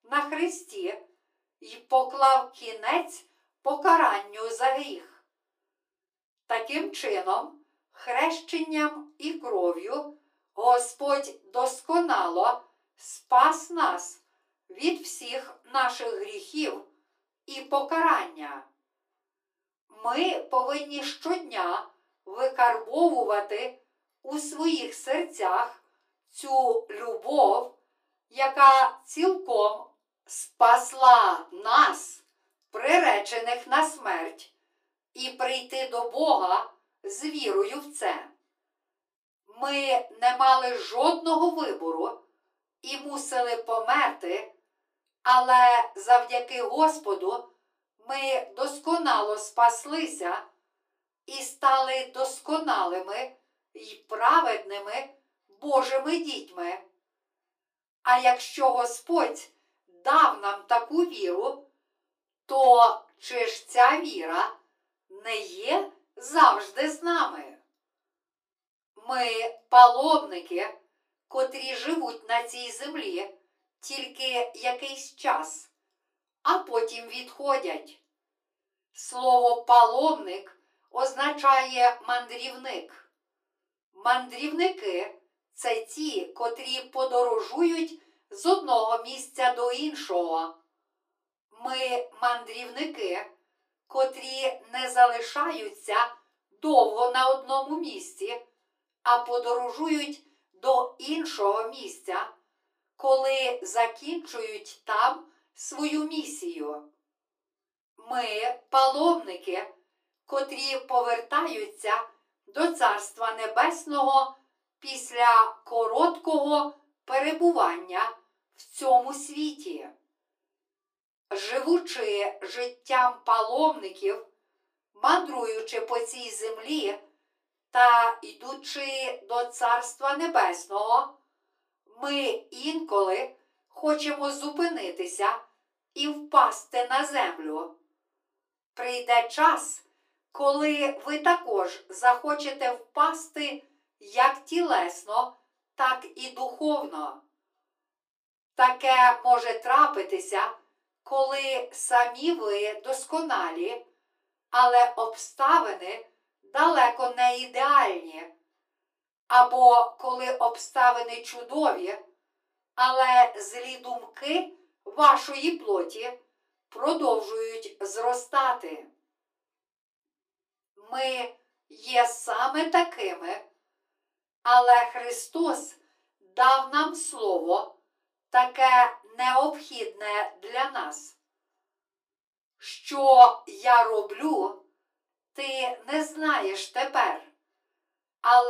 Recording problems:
off-mic speech; far
thin; very; fading below 300 Hz
room echo; very slight; dies away in 0.2 s
abrupt cut into speech; at the end

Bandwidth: 15 kHz